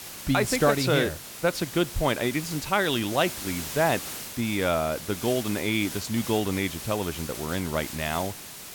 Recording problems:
hiss; loud; throughout; 9 dB below the speech

